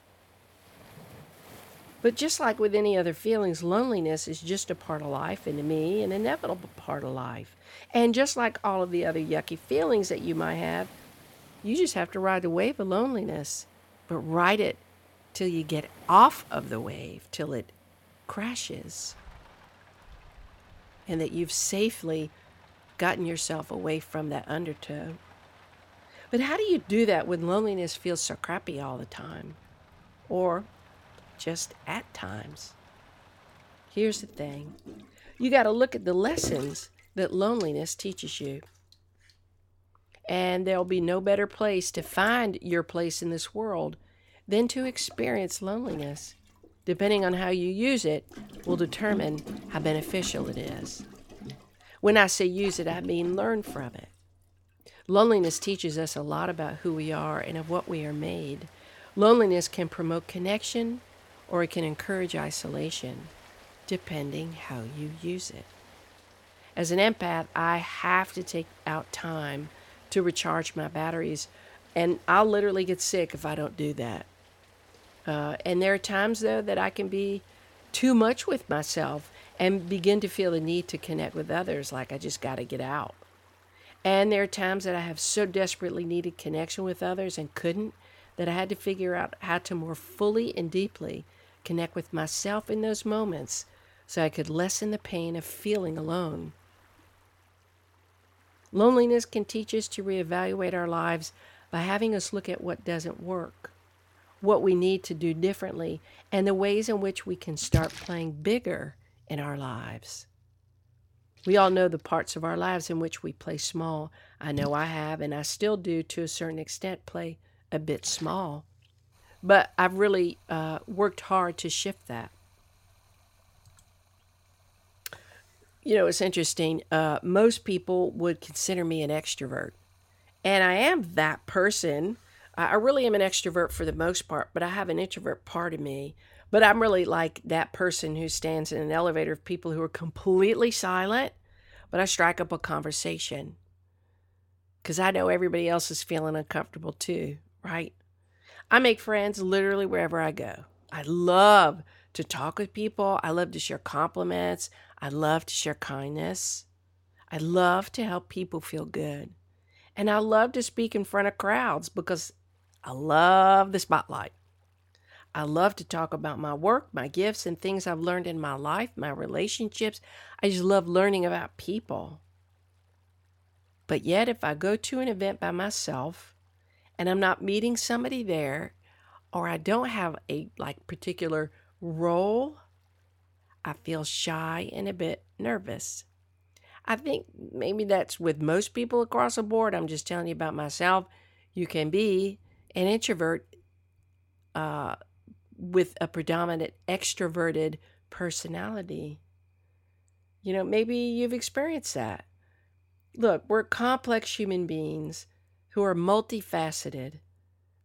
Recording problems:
rain or running water; noticeable; throughout; 20 dB below the speech

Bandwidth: 17 kHz